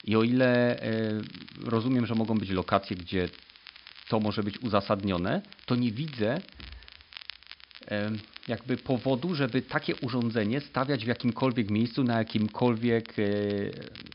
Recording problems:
high frequencies cut off; noticeable; nothing above 5.5 kHz
crackle, like an old record; noticeable; 20 dB below the speech
hiss; faint; throughout; 30 dB below the speech

